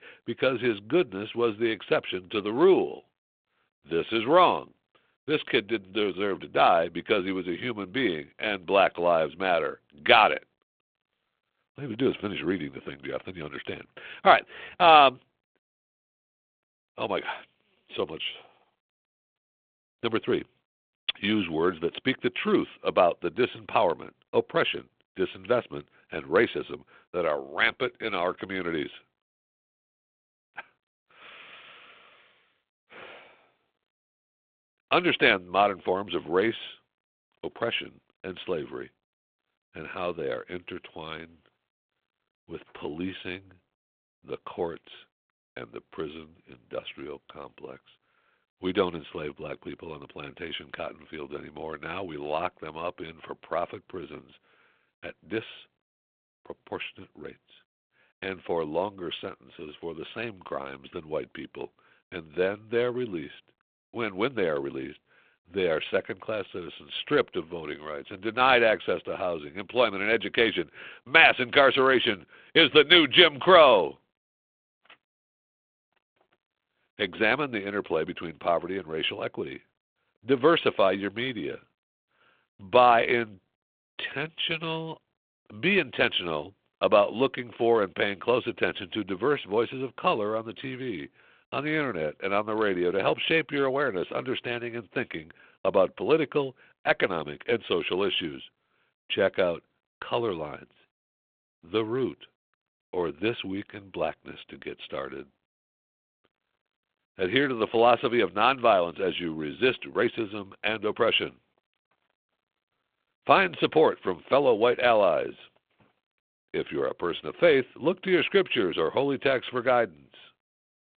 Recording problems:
phone-call audio

